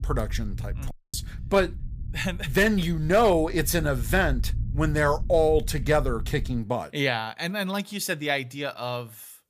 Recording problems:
low rumble; faint; until 6.5 s; 25 dB below the speech
audio cutting out; at 1 s

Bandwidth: 15 kHz